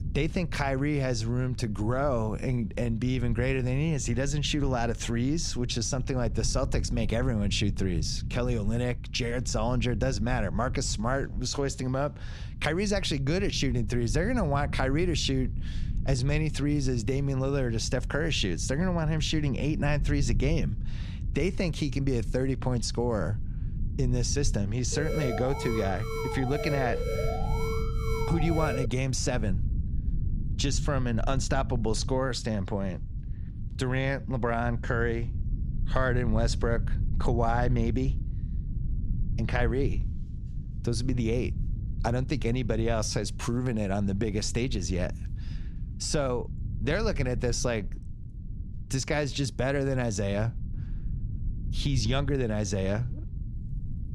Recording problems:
low rumble; noticeable; throughout; 20 dB below the speech
alarm; noticeable; from 25 to 29 s; peak 3 dB below the speech

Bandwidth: 15 kHz